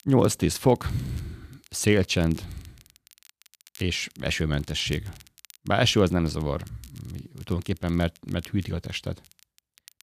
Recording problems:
crackle, like an old record; faint; 25 dB below the speech

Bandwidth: 14.5 kHz